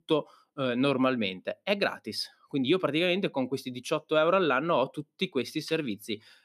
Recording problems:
none

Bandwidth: 14.5 kHz